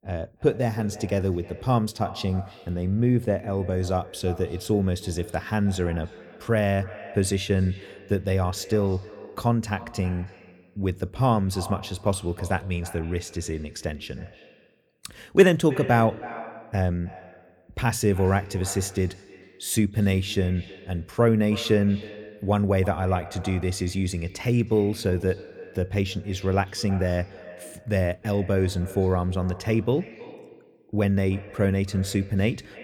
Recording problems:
echo of what is said; noticeable; throughout; 320 ms later, 20 dB below the speech

